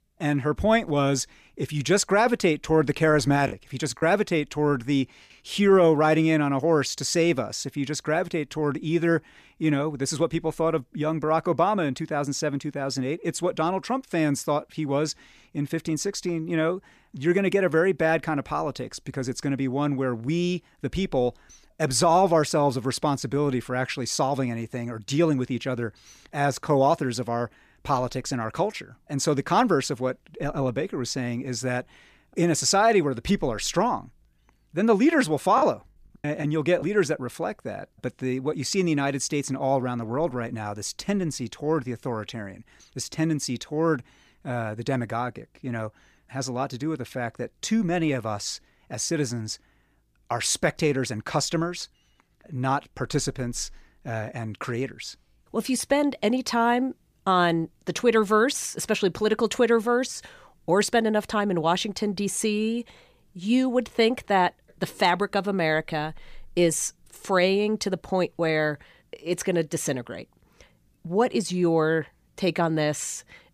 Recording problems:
choppy; occasionally; at 3.5 s and from 36 to 37 s; 5% of the speech affected

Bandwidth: 15 kHz